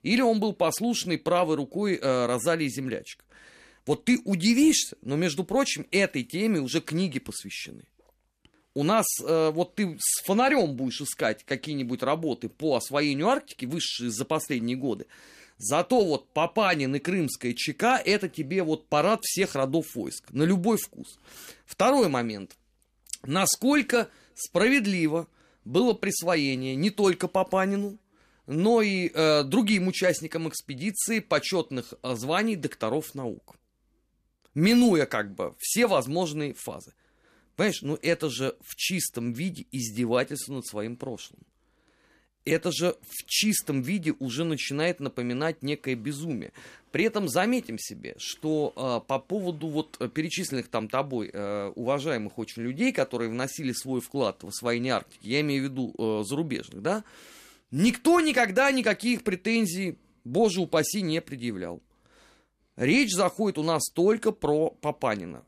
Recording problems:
none

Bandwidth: 14.5 kHz